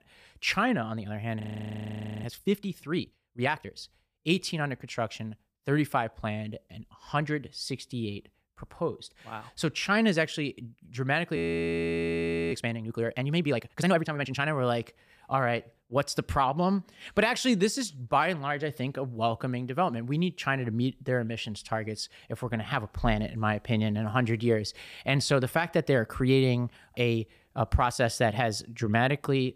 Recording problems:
audio freezing; at 1.5 s for 1 s and at 11 s for 1 s

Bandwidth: 15 kHz